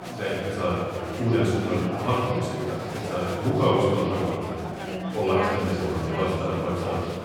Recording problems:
room echo; strong; dies away in 1.9 s
off-mic speech; far
chatter from many people; loud; throughout; 7 dB below the speech

